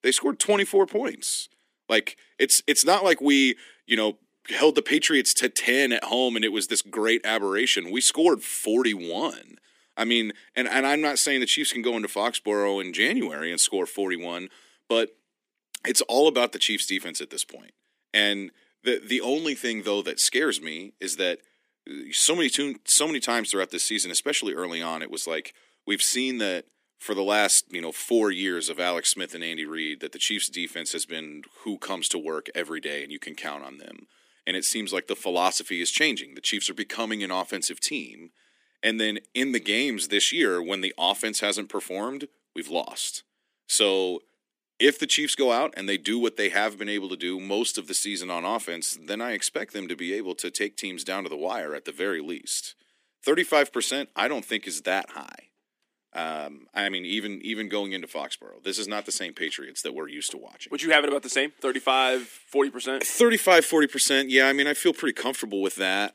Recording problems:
thin; somewhat; fading below 250 Hz

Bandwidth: 15 kHz